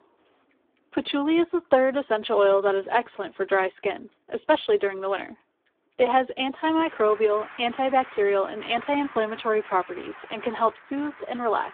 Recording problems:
phone-call audio; poor line; nothing above 3.5 kHz
traffic noise; noticeable; throughout; 20 dB below the speech

